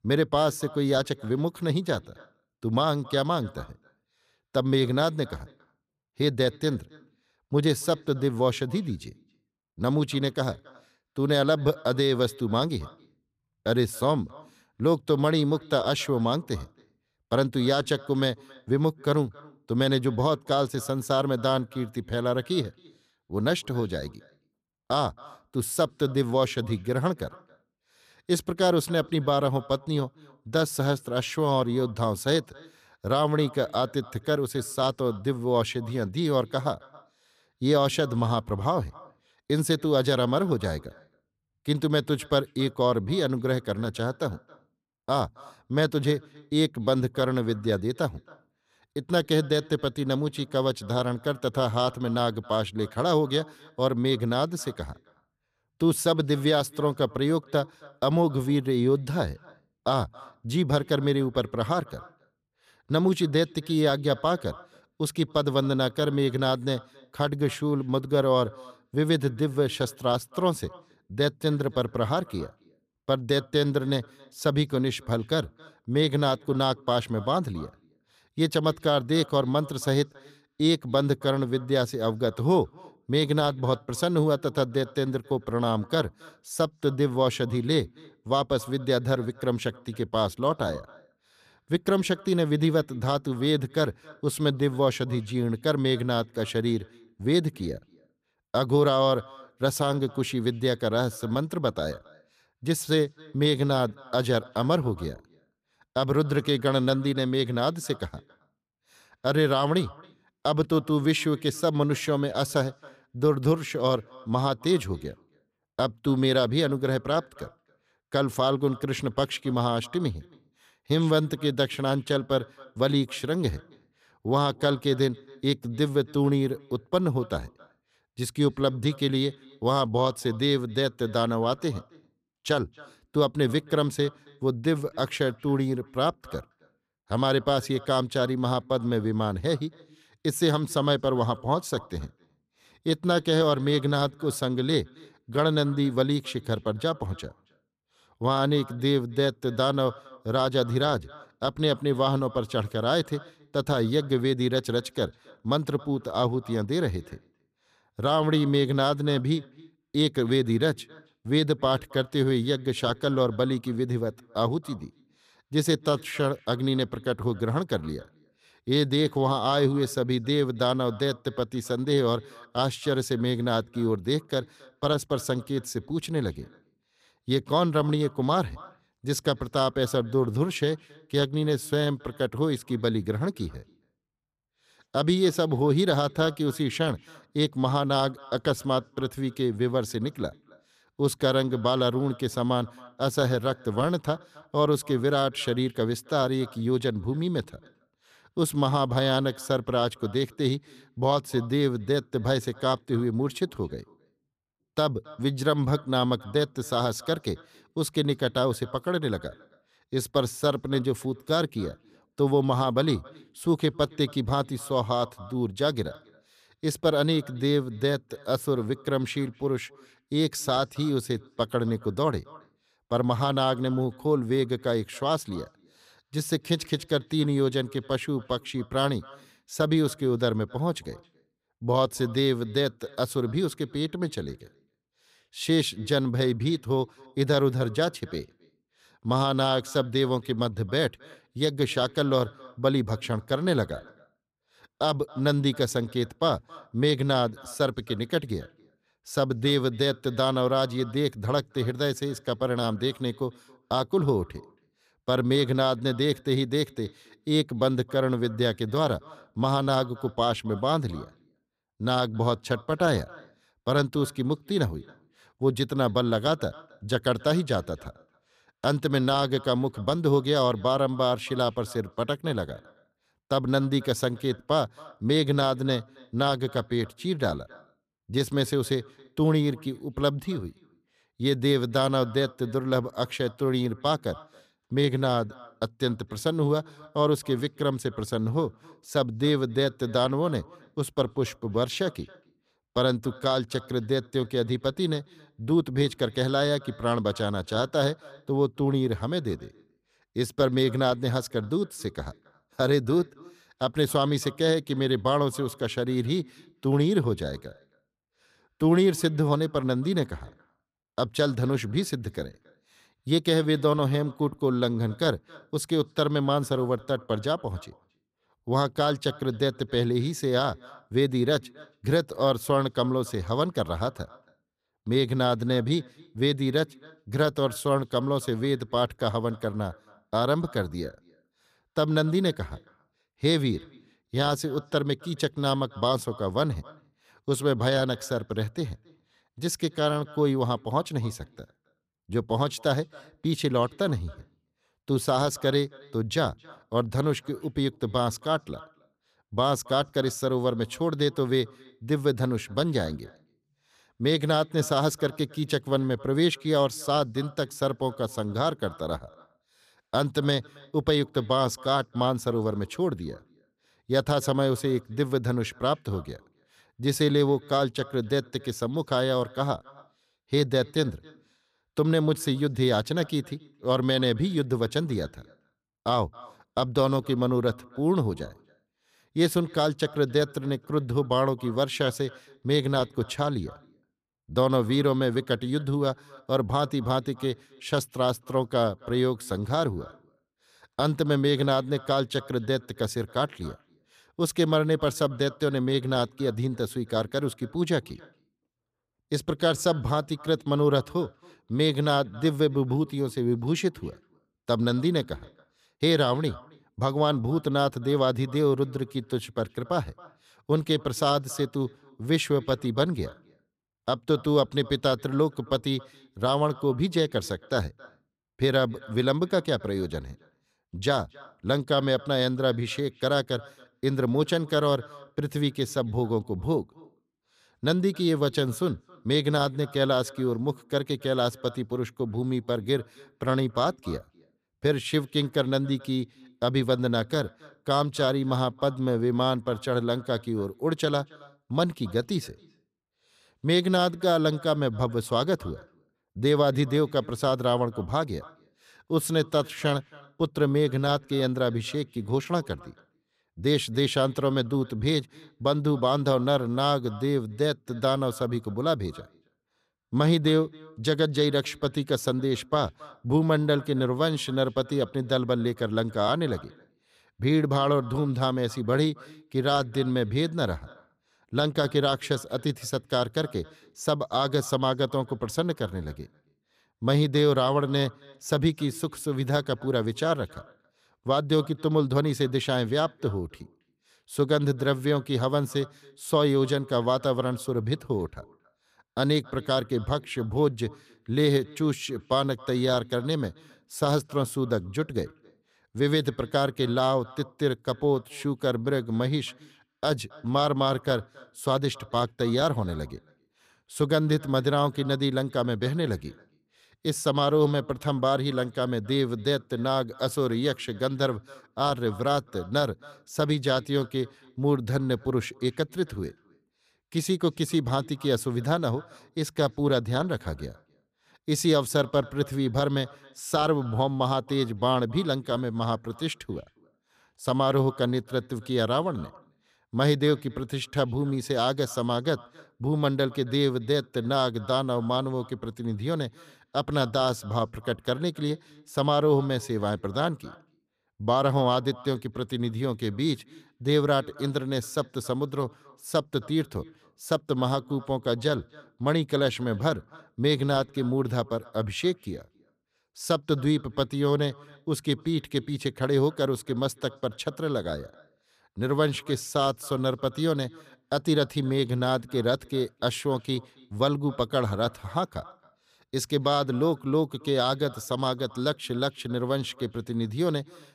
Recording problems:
echo of what is said; faint; throughout; 270 ms later, 25 dB below the speech

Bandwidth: 14.5 kHz